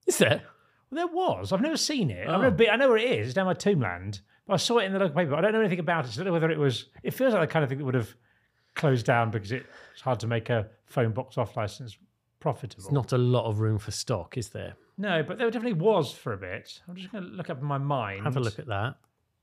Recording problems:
none

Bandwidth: 15 kHz